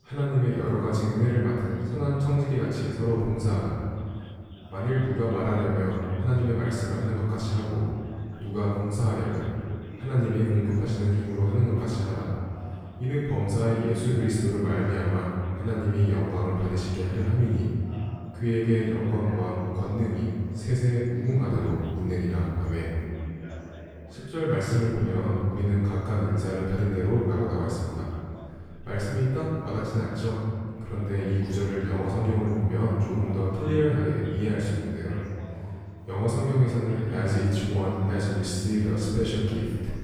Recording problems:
room echo; strong; dies away in 2.1 s
off-mic speech; far
background chatter; faint; throughout; 3 voices, 20 dB below the speech

